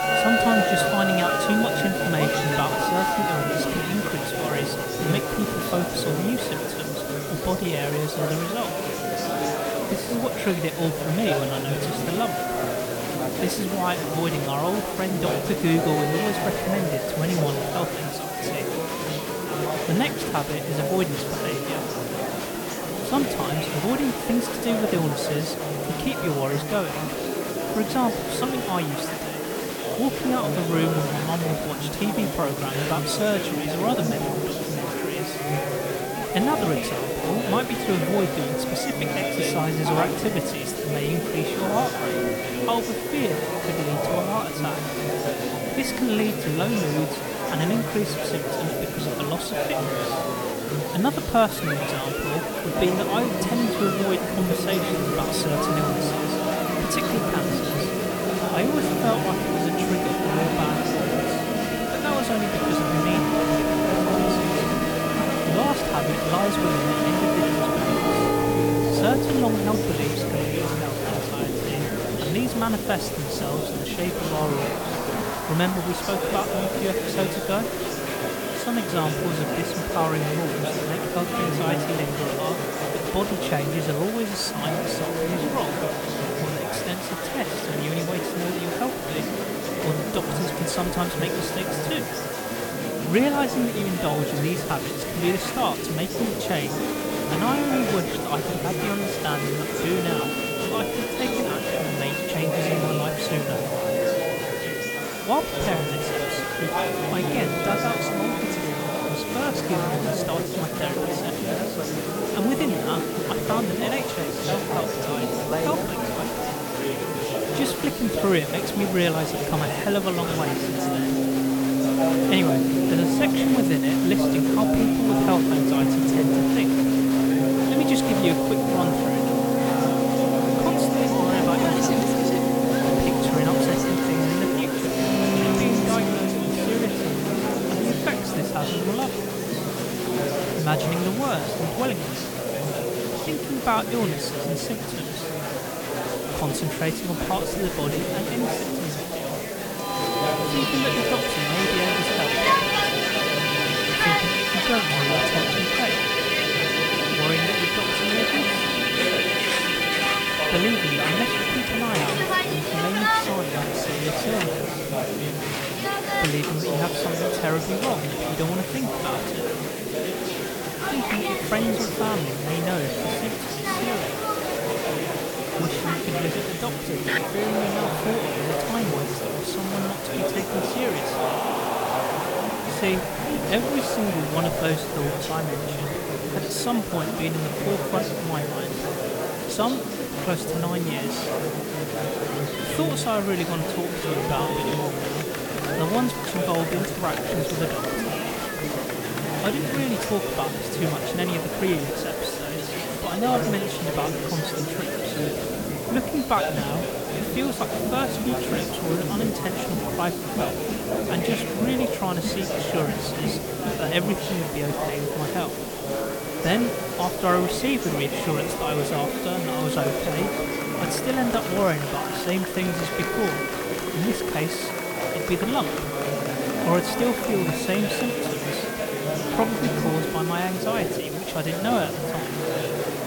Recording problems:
background music; very loud; throughout; 1 dB above the speech
murmuring crowd; very loud; throughout; 1 dB above the speech
hiss; loud; throughout; 8 dB below the speech

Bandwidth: 18 kHz